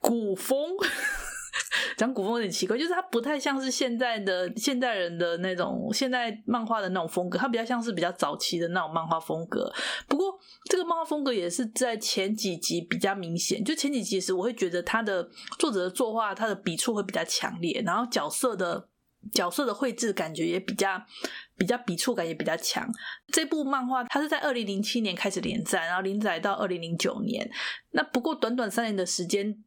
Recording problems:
squashed, flat; somewhat

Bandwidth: 18 kHz